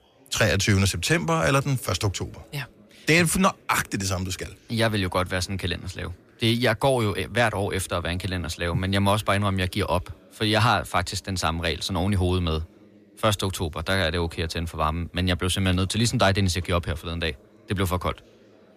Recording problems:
chatter from many people; faint; throughout; 30 dB below the speech

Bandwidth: 14.5 kHz